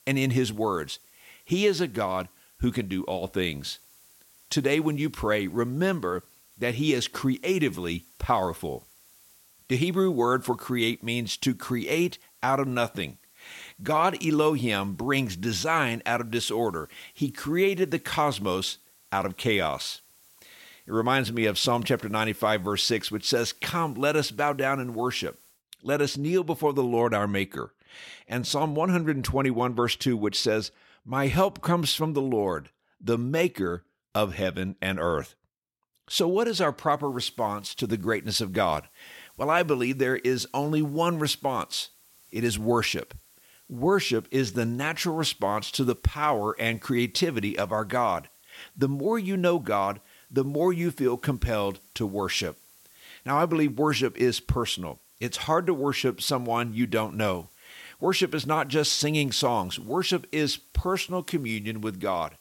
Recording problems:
hiss; faint; until 26 s and from 37 s on; 30 dB below the speech

